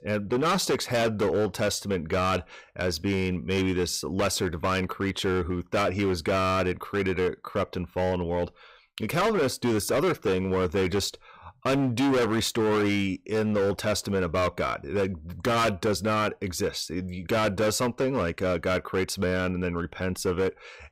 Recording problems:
distortion; heavy; 15% of the sound clipped

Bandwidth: 15.5 kHz